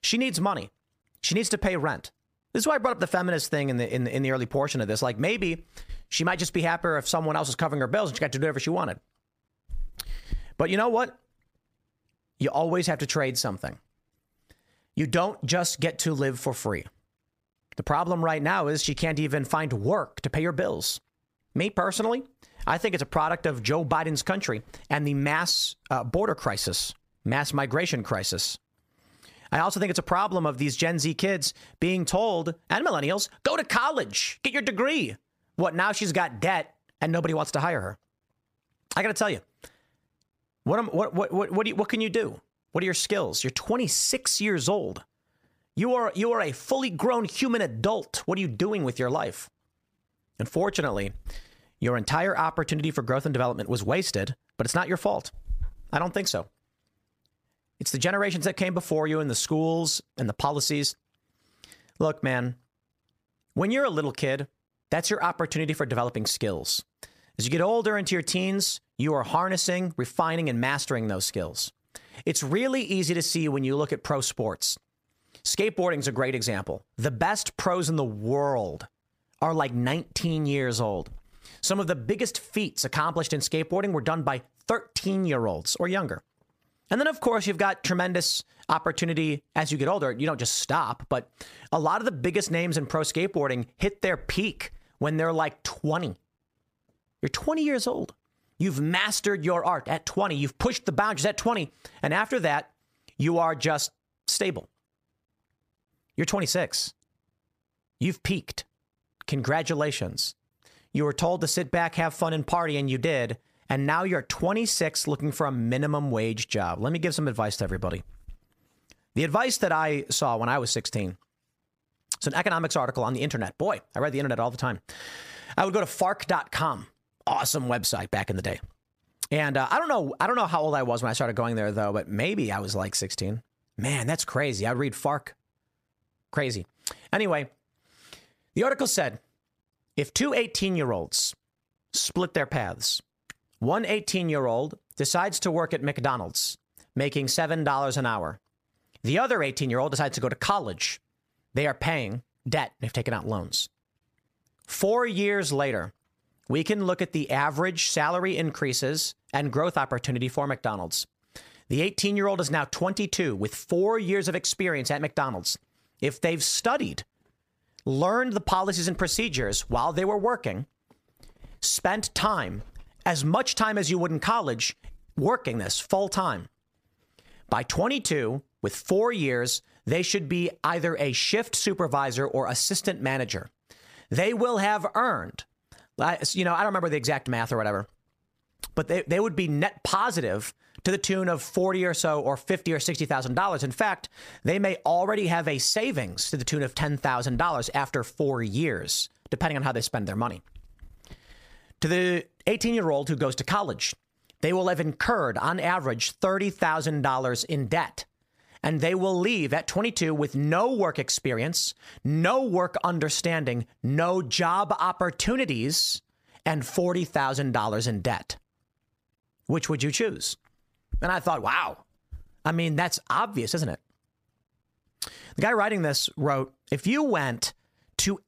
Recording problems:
squashed, flat; heavily

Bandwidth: 15 kHz